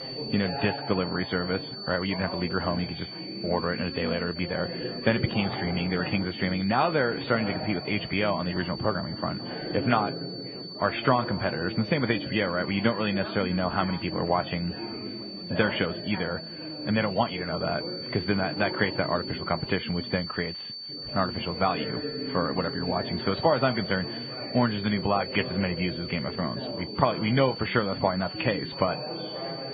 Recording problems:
garbled, watery; badly
muffled; very; fading above 3 kHz
high-pitched whine; loud; throughout; 4.5 kHz, 9 dB below the speech
background chatter; loud; throughout; 4 voices, 9 dB below the speech

